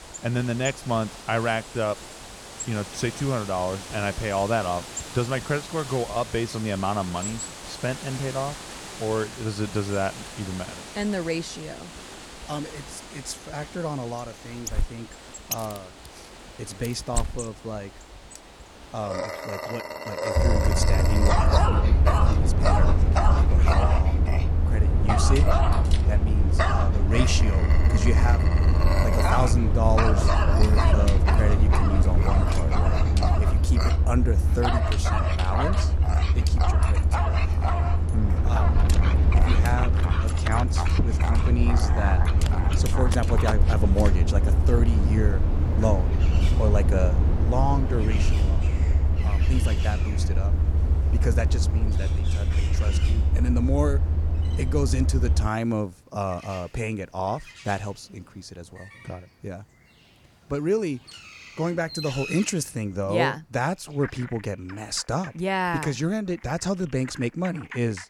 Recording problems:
animal sounds; loud; throughout; 4 dB below the speech
low rumble; loud; from 20 to 55 s; 6 dB below the speech

